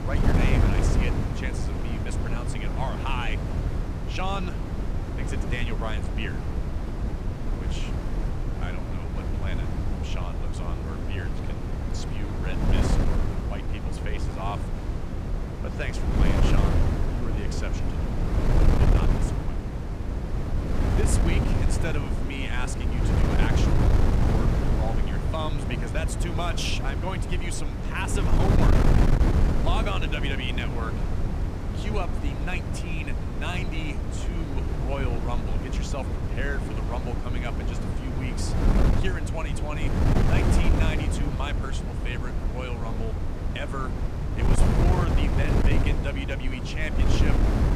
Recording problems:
wind noise on the microphone; heavy; as loud as the speech

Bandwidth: 15 kHz